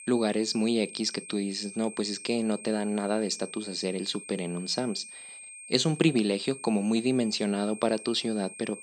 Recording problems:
high-pitched whine; noticeable; throughout; 8.5 kHz, 15 dB below the speech

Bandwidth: 14.5 kHz